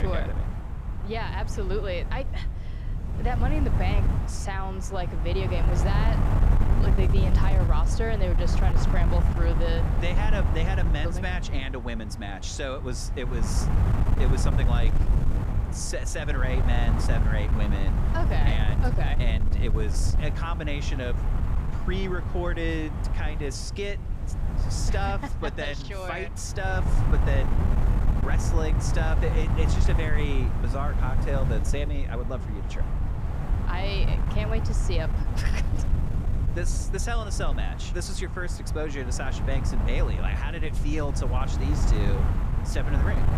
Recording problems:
wind noise on the microphone; heavy; 4 dB below the speech
murmuring crowd; faint; throughout; 25 dB below the speech
abrupt cut into speech; at the start

